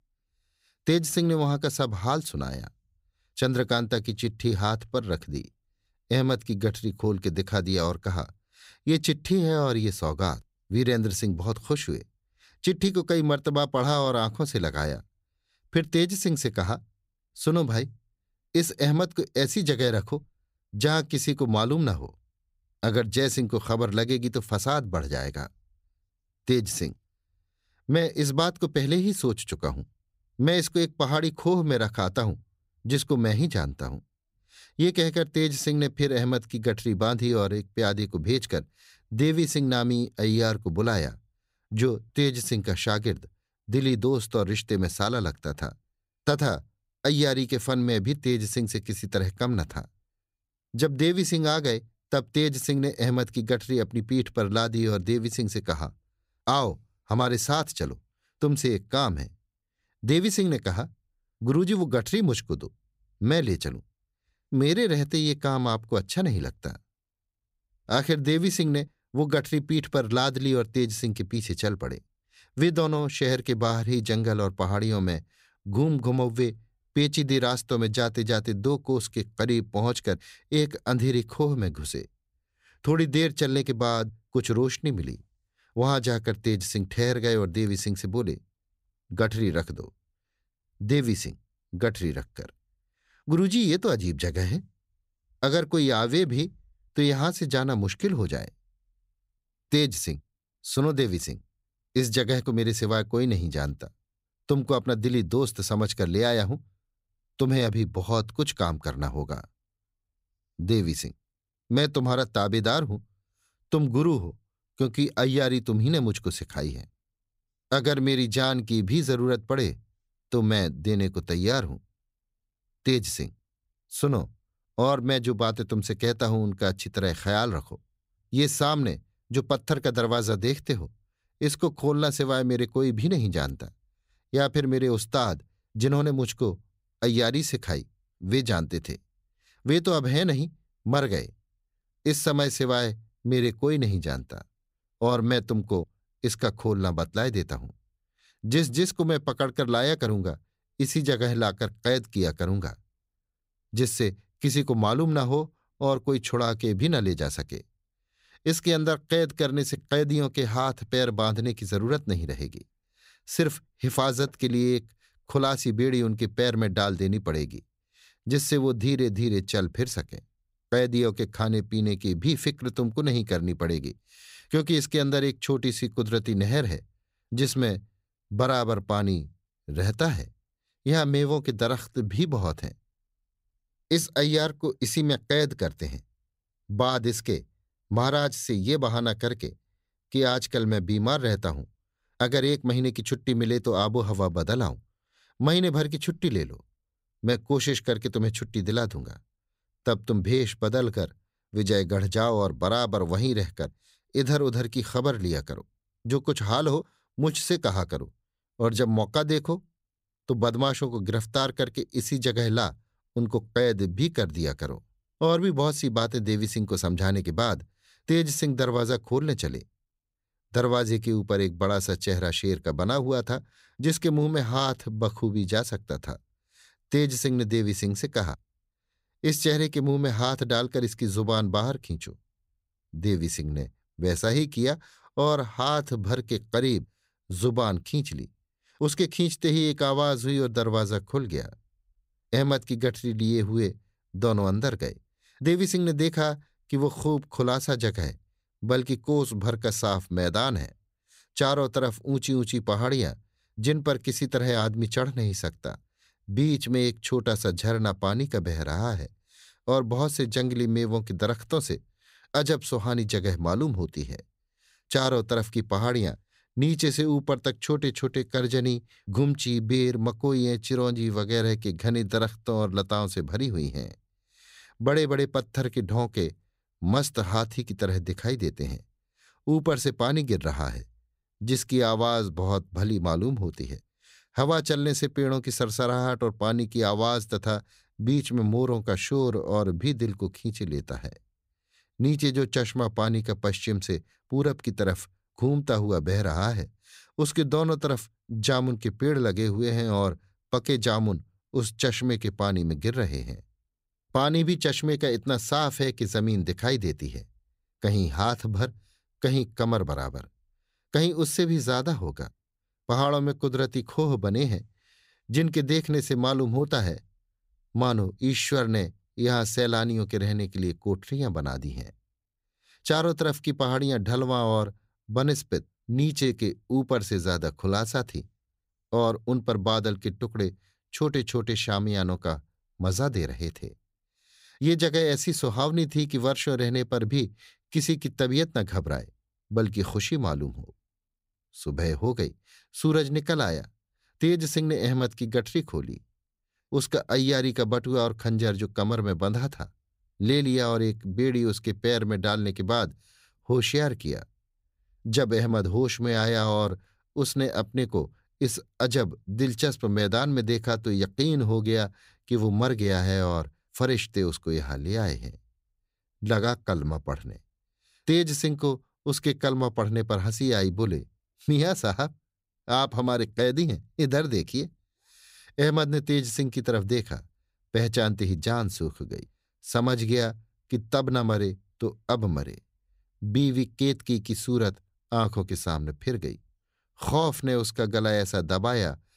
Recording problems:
none

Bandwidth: 15.5 kHz